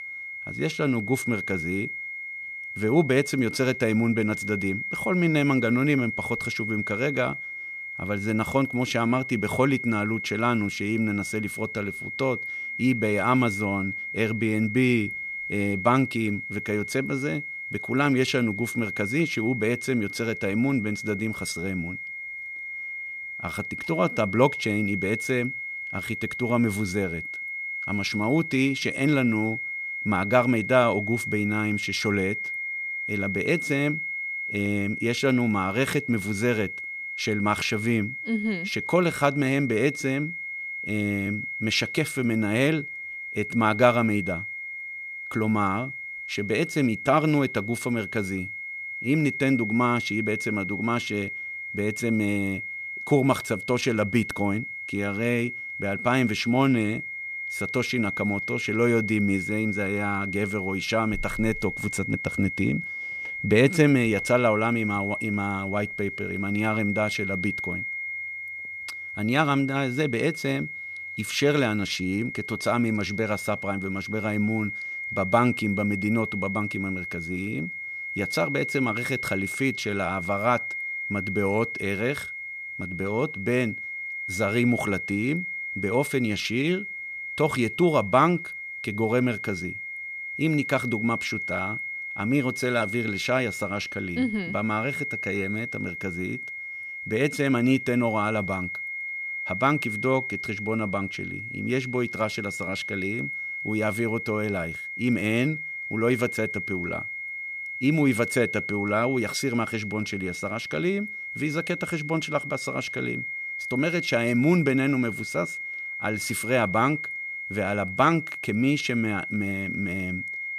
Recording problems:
high-pitched whine; loud; throughout; 2 kHz, 5 dB below the speech

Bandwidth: 14 kHz